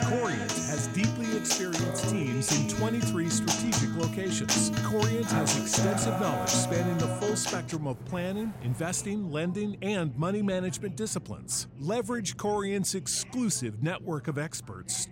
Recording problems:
background music; very loud; throughout; 2 dB above the speech
rain or running water; noticeable; throughout; 20 dB below the speech
voice in the background; faint; throughout; 25 dB below the speech

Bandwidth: 16 kHz